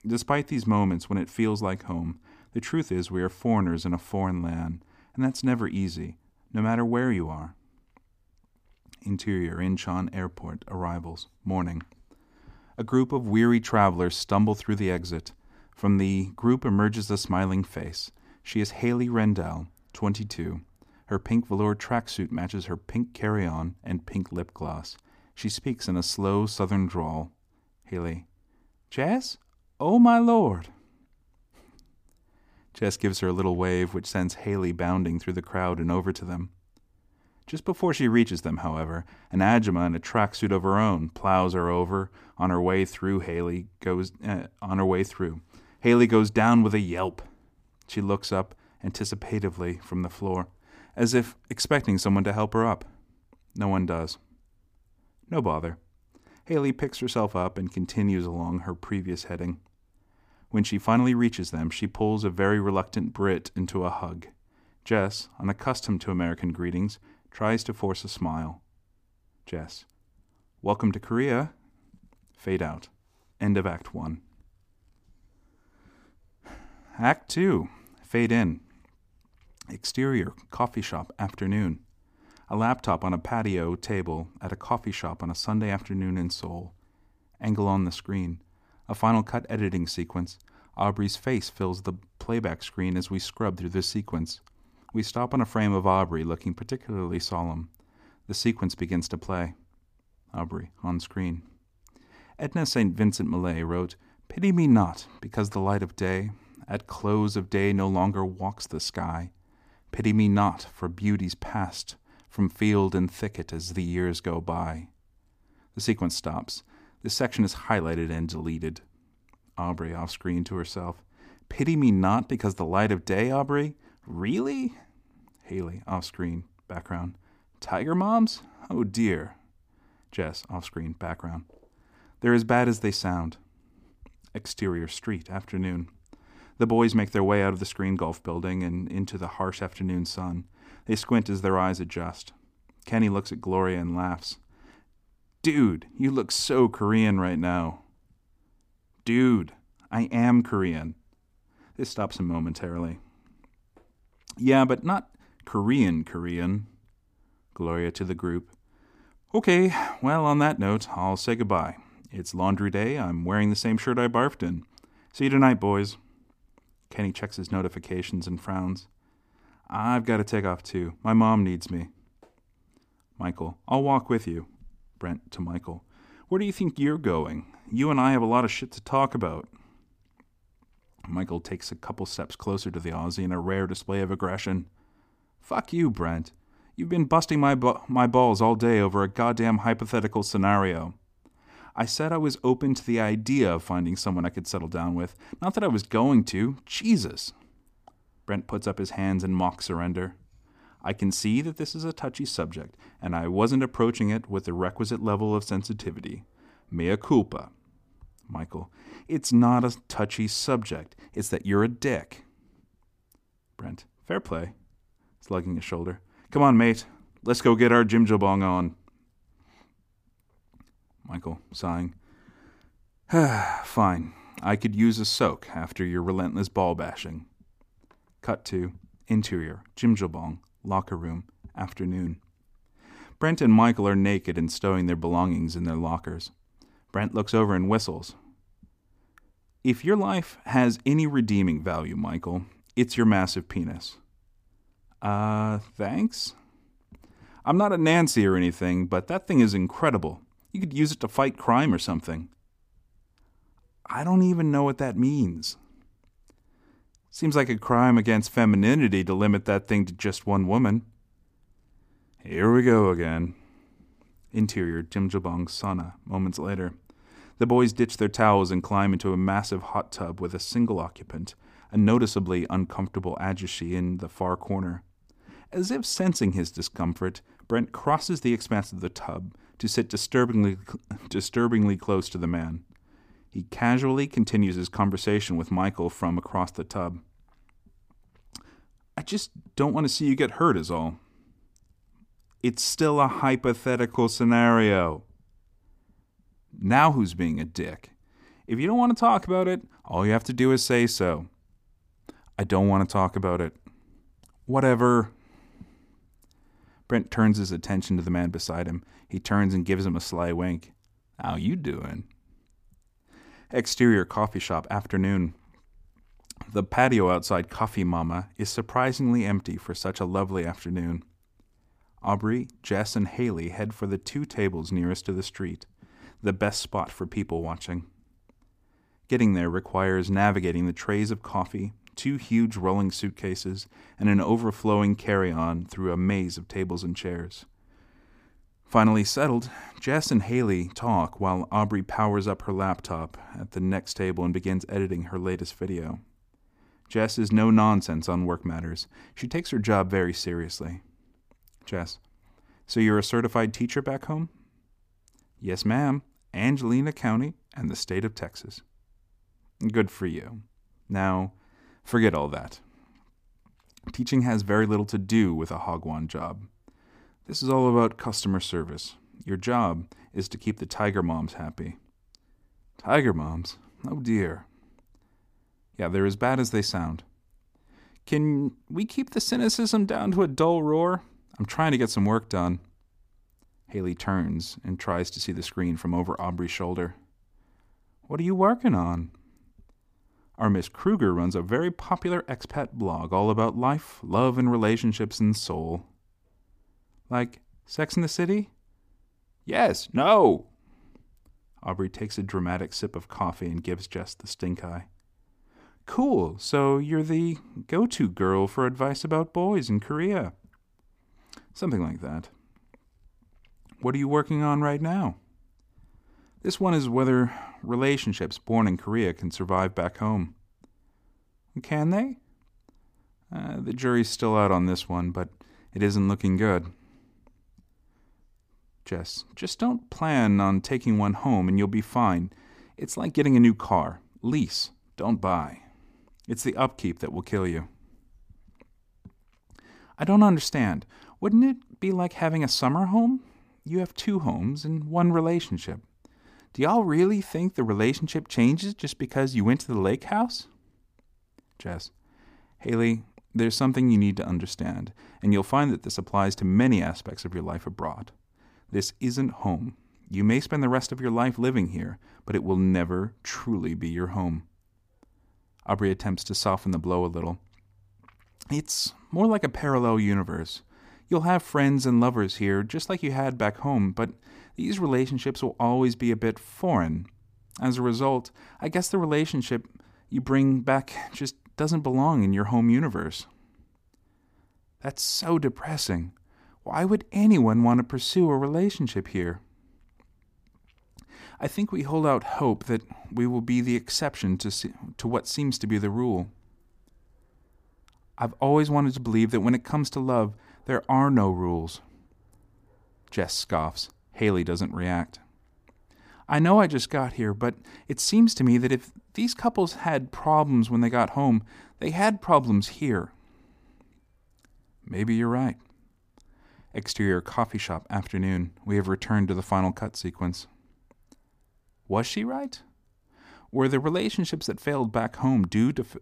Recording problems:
none

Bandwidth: 15 kHz